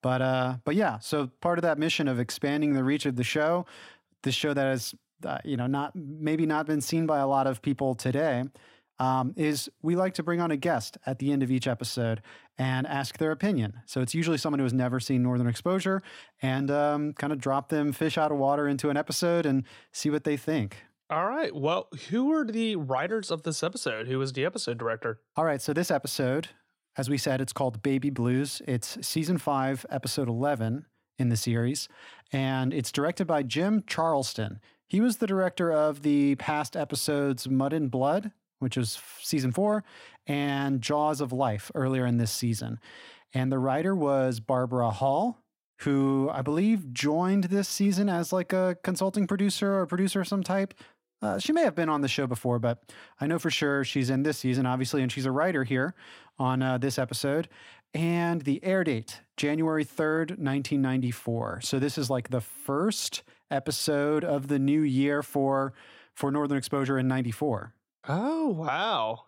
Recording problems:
none

